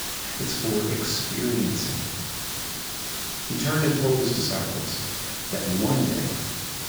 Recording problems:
off-mic speech; far
garbled, watery; badly; nothing above 7.5 kHz
room echo; noticeable; dies away in 1.5 s
hiss; loud; throughout; 2 dB below the speech

